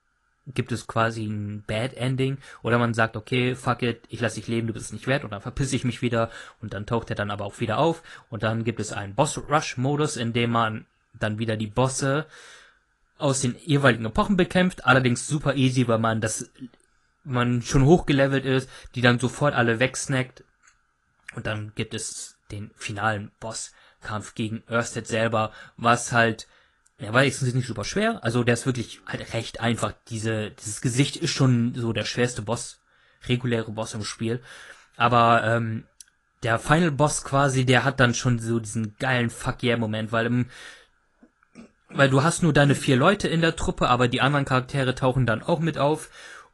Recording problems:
garbled, watery; slightly; nothing above 10.5 kHz

